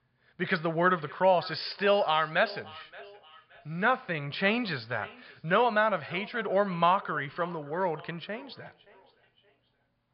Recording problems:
high frequencies cut off; severe; nothing above 5 kHz
echo of what is said; faint; throughout; 570 ms later, 20 dB below the speech

